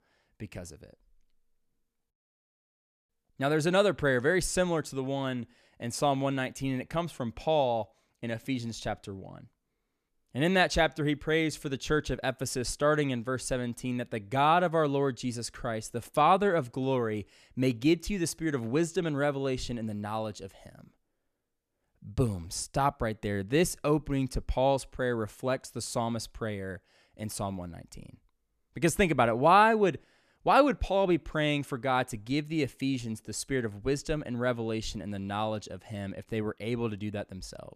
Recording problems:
none

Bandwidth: 14 kHz